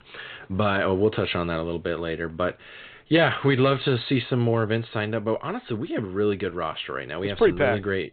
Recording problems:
high frequencies cut off; severe; nothing above 4 kHz

